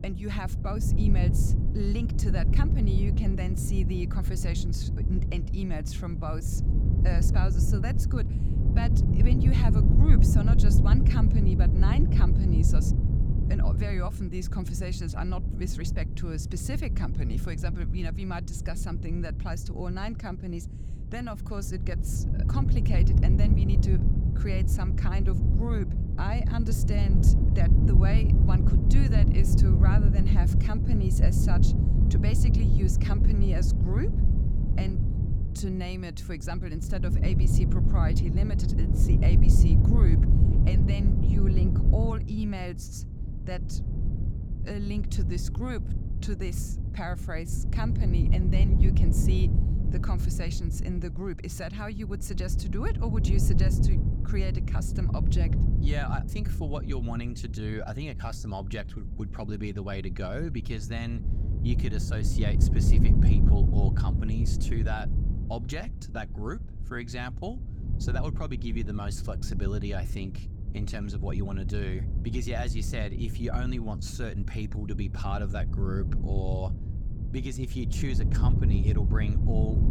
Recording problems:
wind noise on the microphone; heavy; 1 dB below the speech

